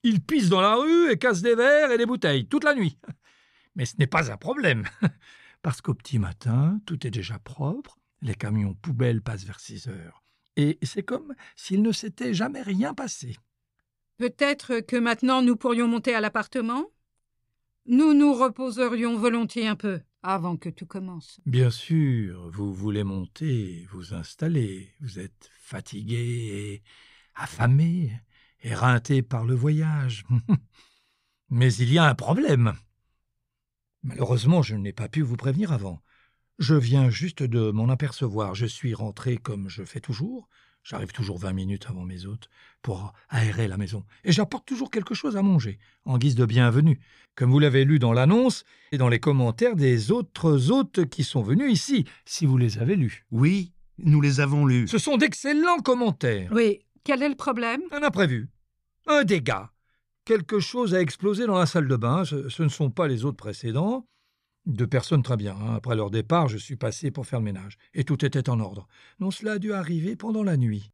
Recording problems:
none

